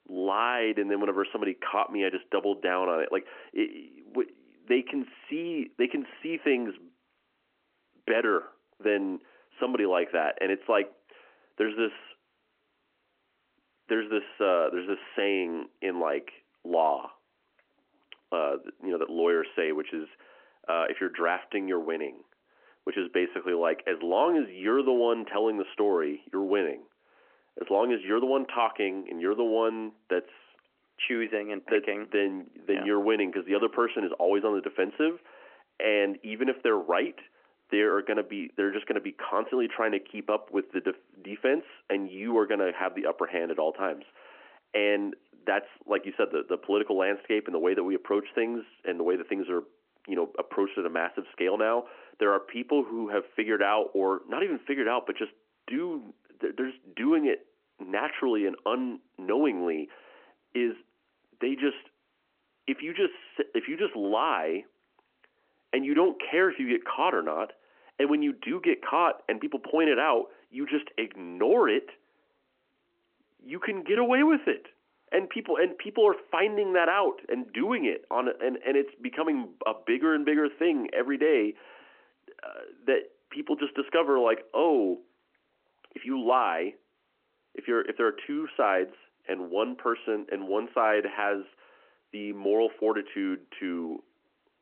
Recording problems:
phone-call audio

